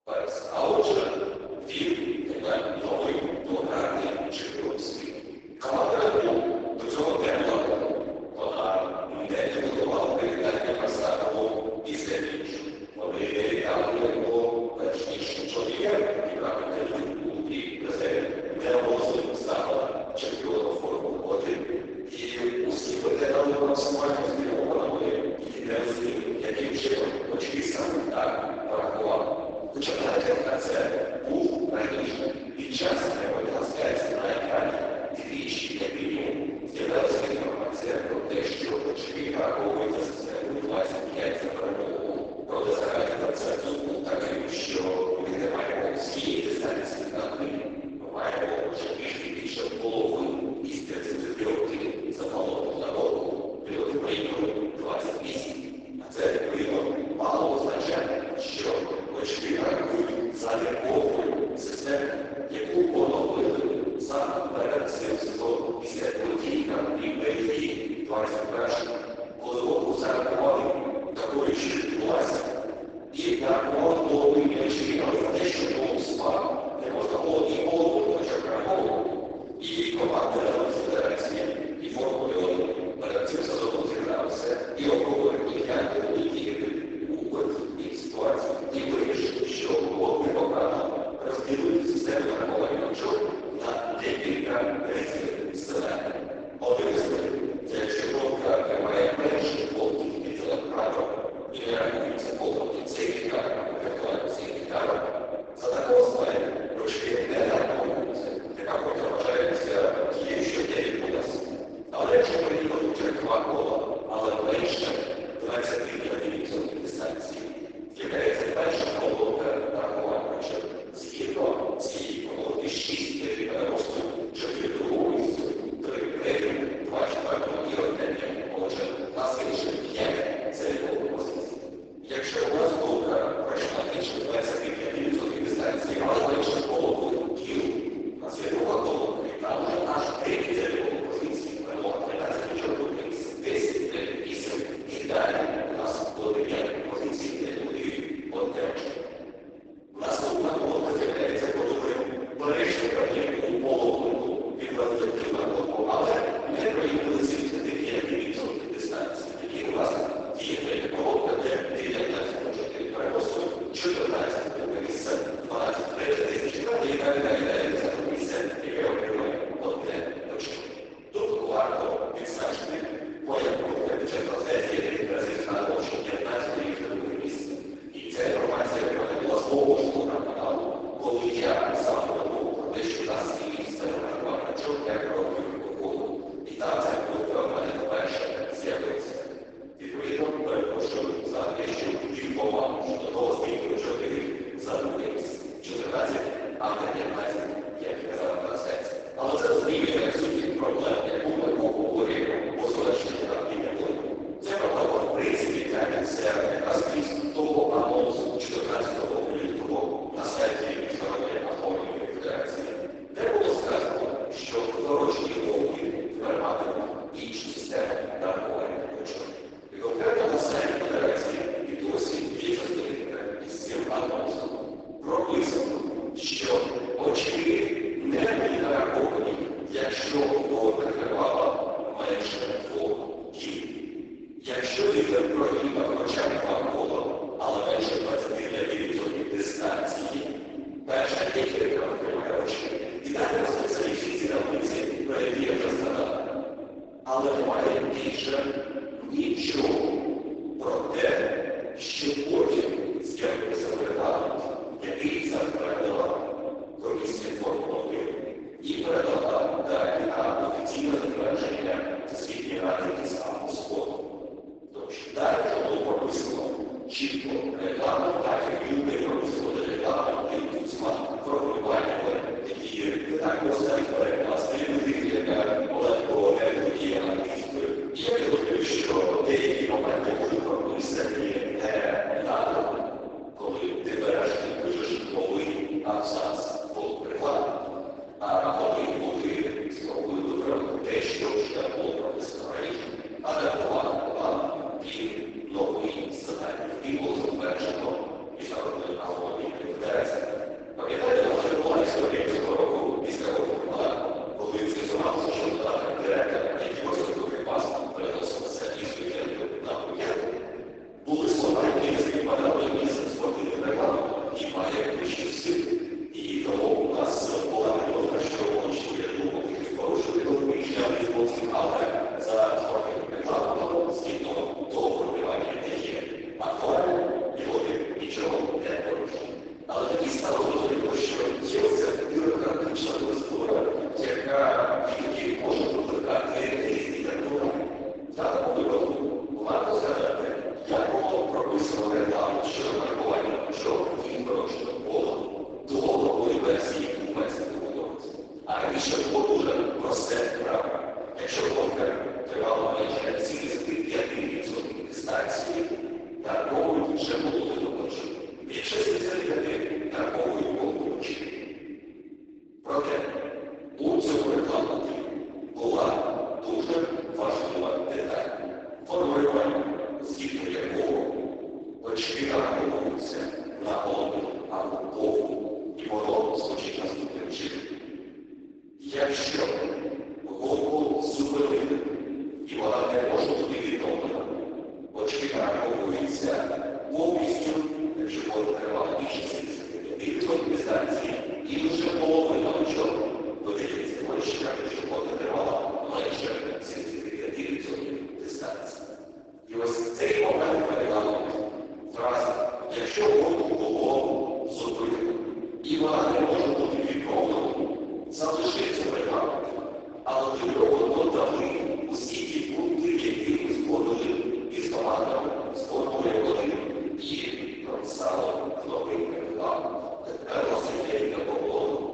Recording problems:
room echo; strong; dies away in 3 s
off-mic speech; far
garbled, watery; badly; nothing above 7.5 kHz
thin; very slightly; fading below 300 Hz

